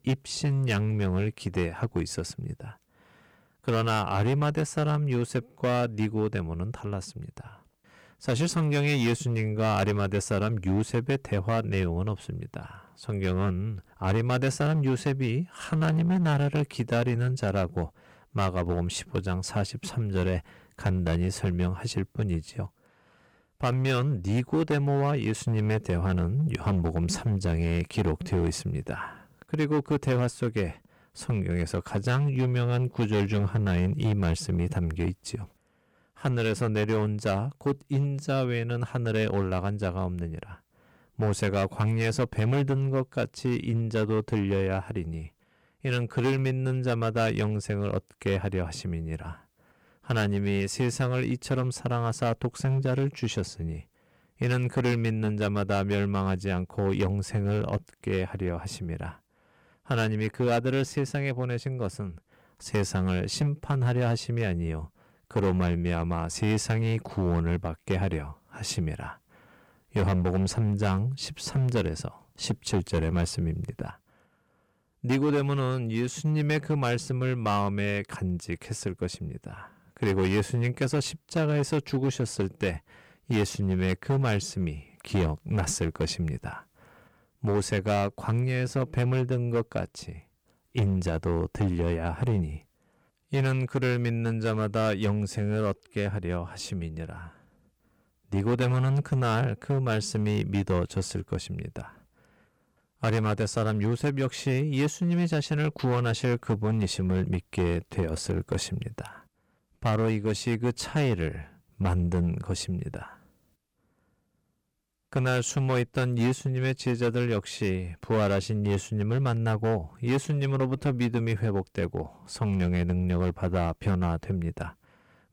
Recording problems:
distortion; slight; 7% of the sound clipped

